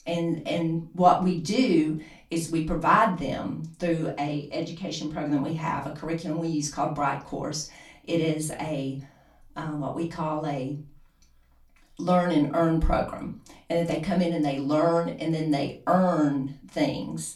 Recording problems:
off-mic speech; far
room echo; very slight; dies away in 0.3 s

